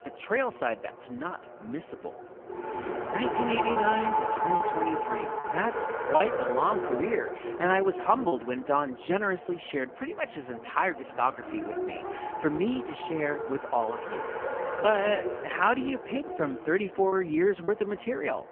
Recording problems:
phone-call audio; poor line; nothing above 3 kHz
traffic noise; loud; throughout; 3 dB below the speech
choppy; occasionally; 2% of the speech affected

